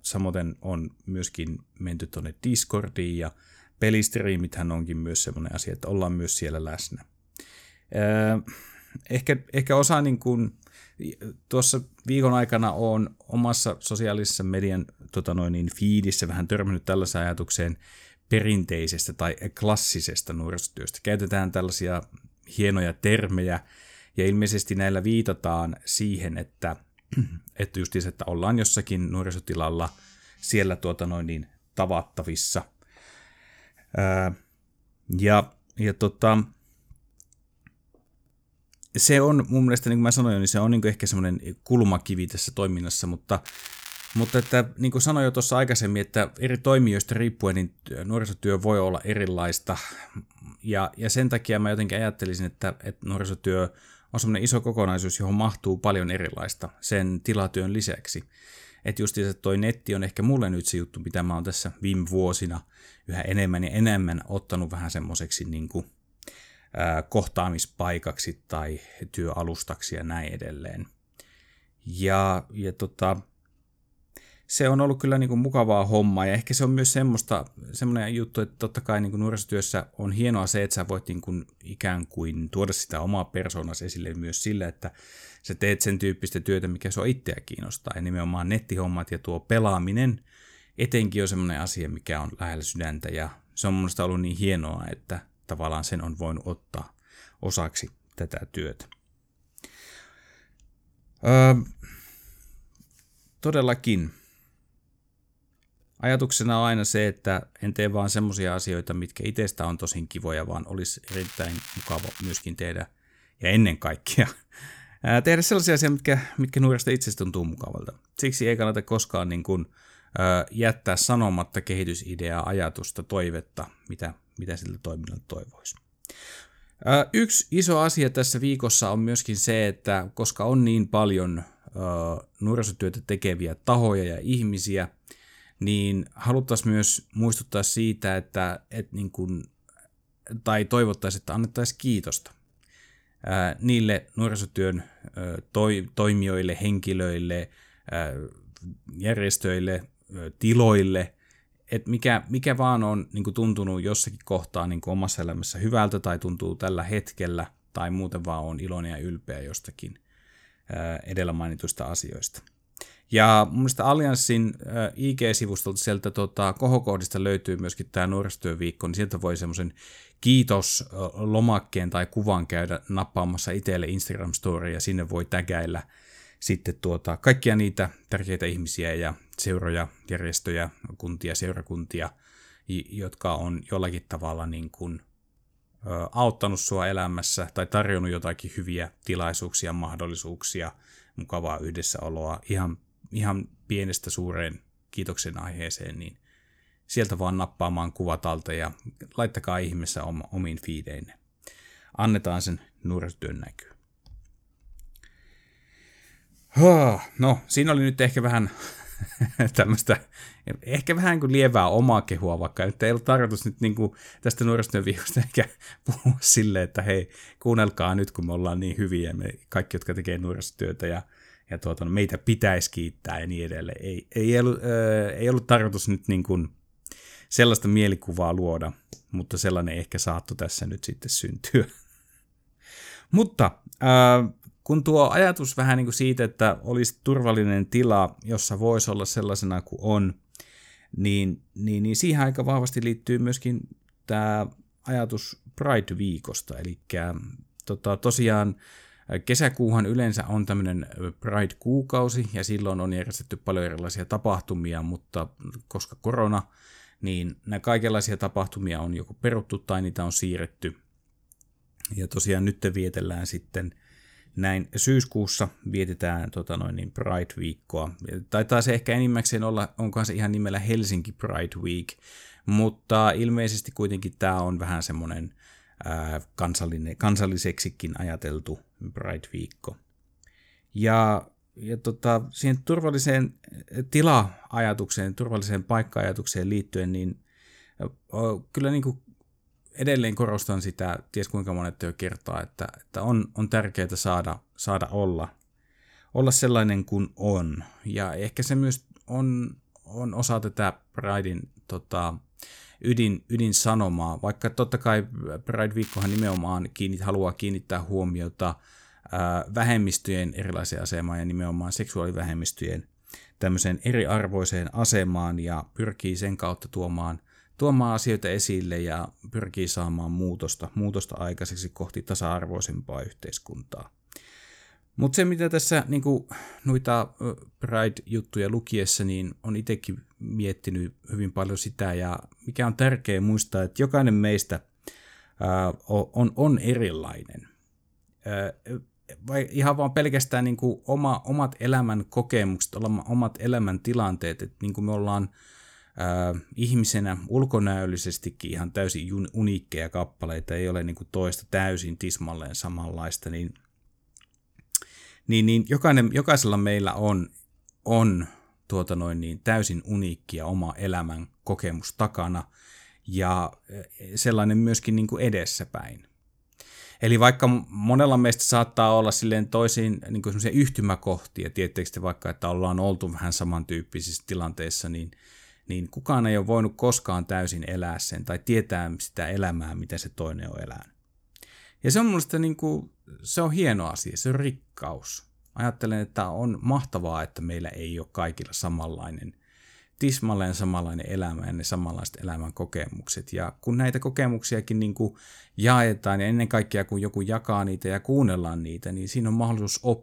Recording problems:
crackling; noticeable; from 43 to 45 s, from 1:51 to 1:52 and at 5:06; 15 dB below the speech

